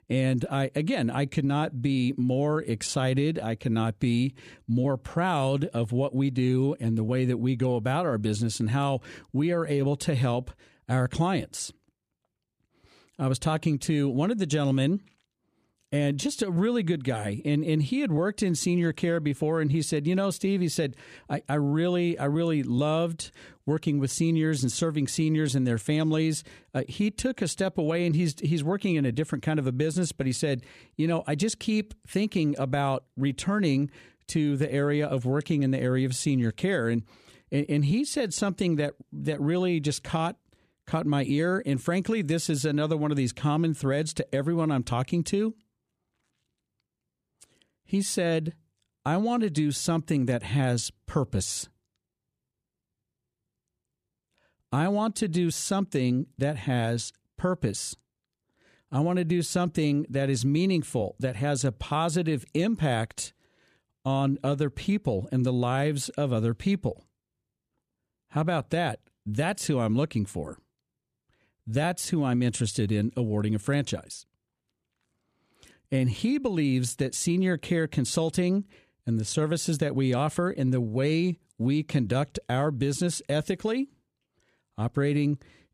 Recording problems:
none

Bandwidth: 14.5 kHz